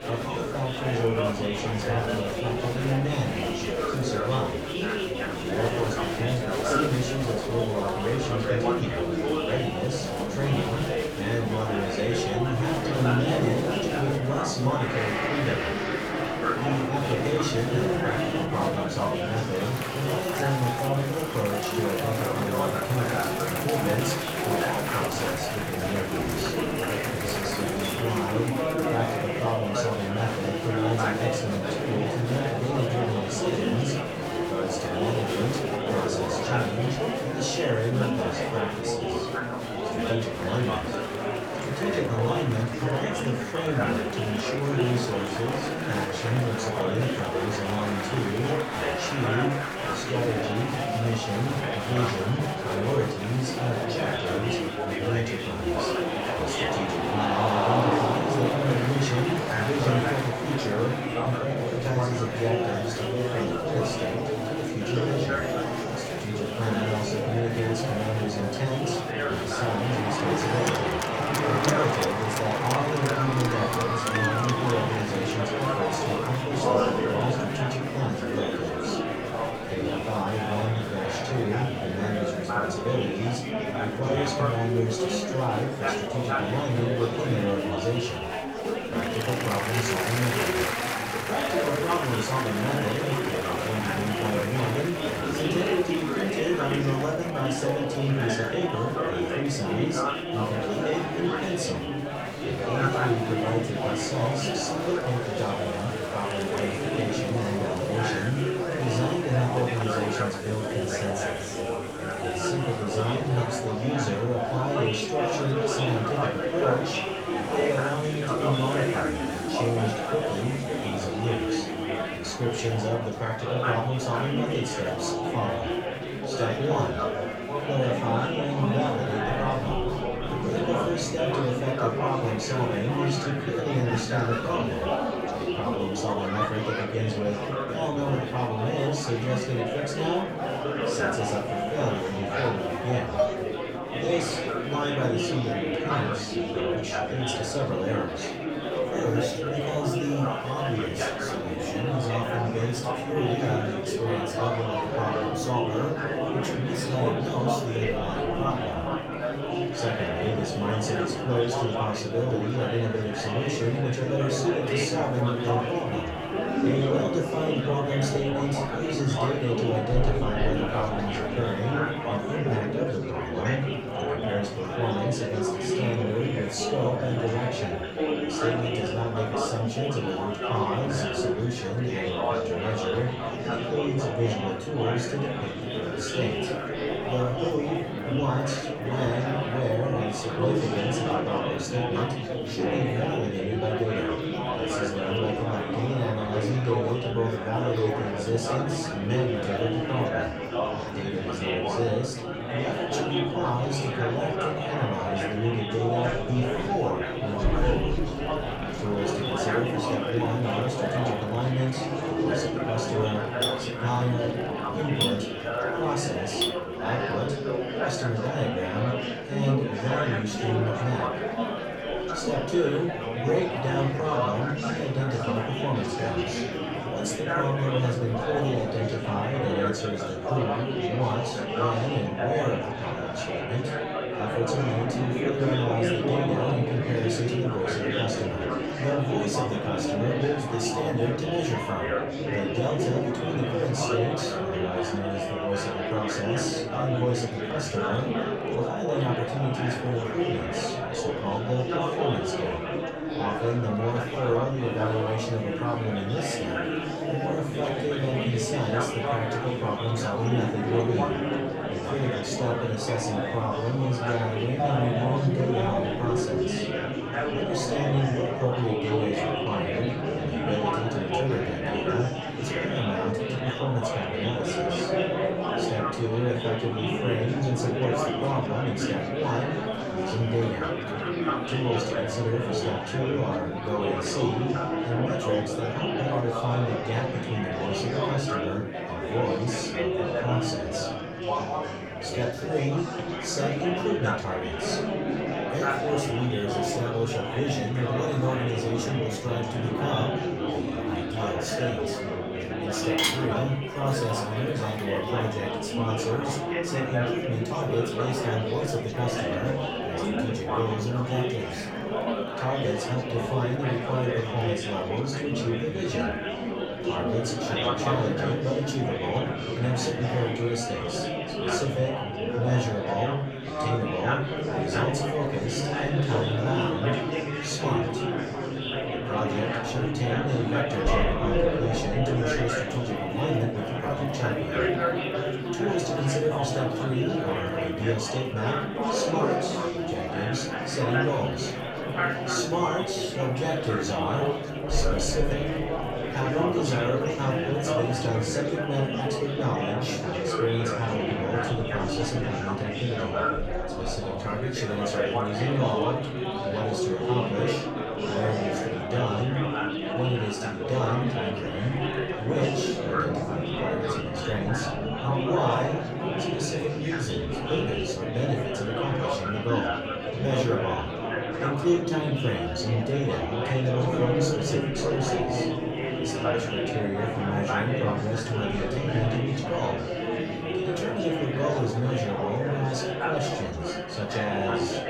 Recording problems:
off-mic speech; far
room echo; slight; dies away in 0.4 s
murmuring crowd; very loud; throughout; 1 dB above the speech
background music; noticeable; throughout; 20 dB below the speech
clattering dishes; loud; at 2:23, from 3:33 to 3:37 and from 5:03 to 5:05; peak 5 dB above the speech

